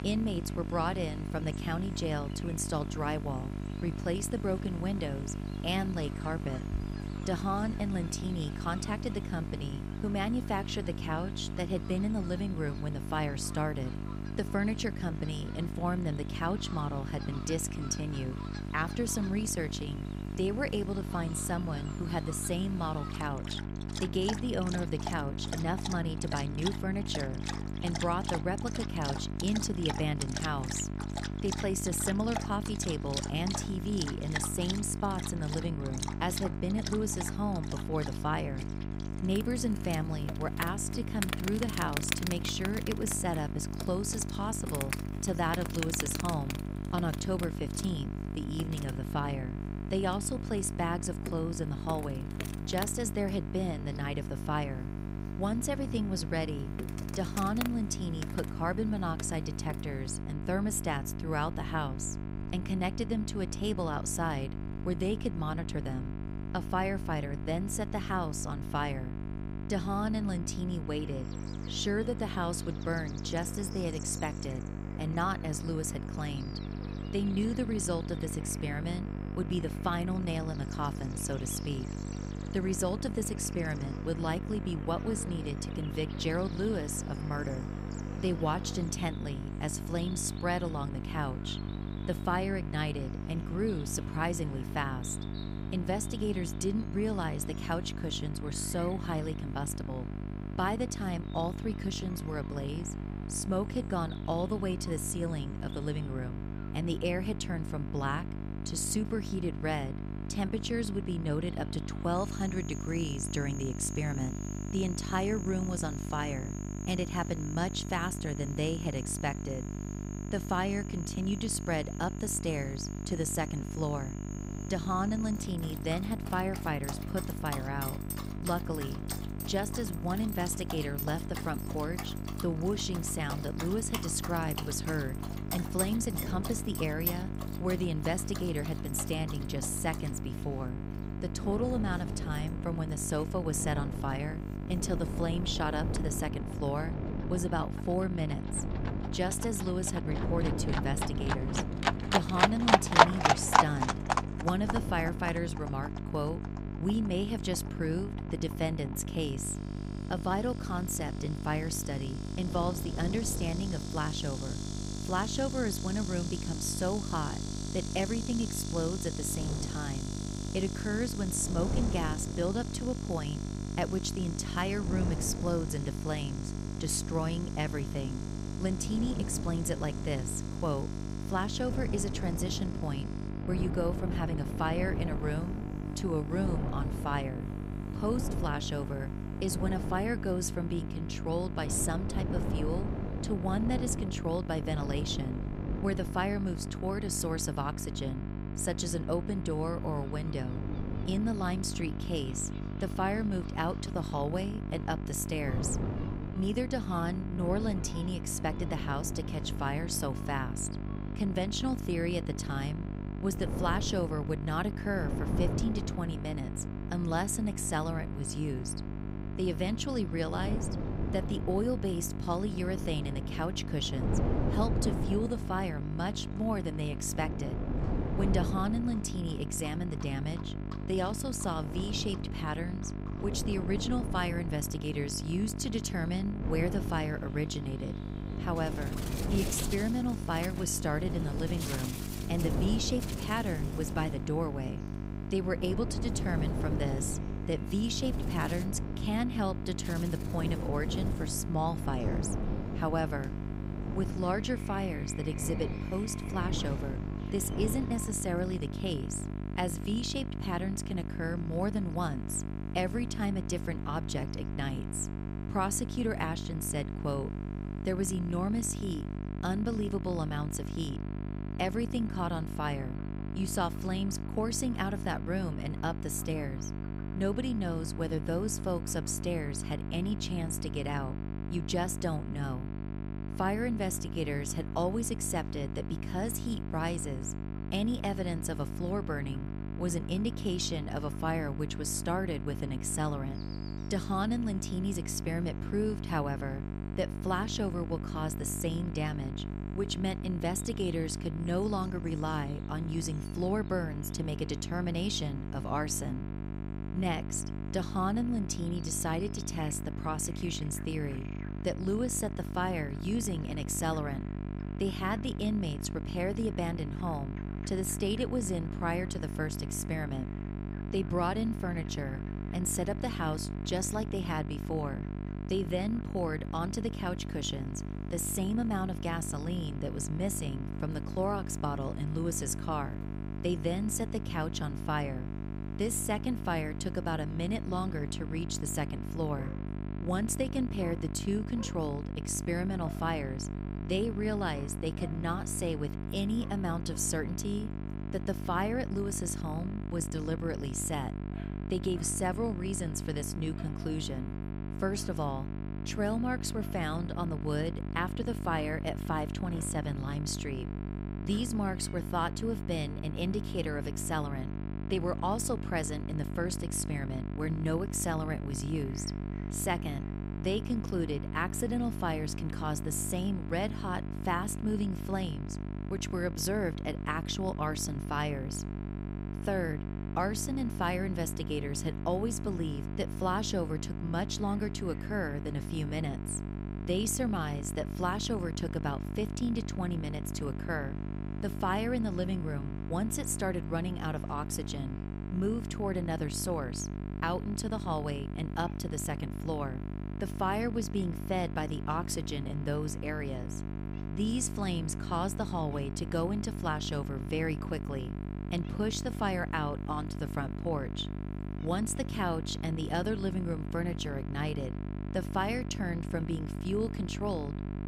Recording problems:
electrical hum; loud; throughout; 50 Hz, 9 dB below the speech
animal sounds; loud; throughout; 7 dB below the speech
wind noise on the microphone; occasional gusts; from 2:04 to 4:19; 10 dB below the speech

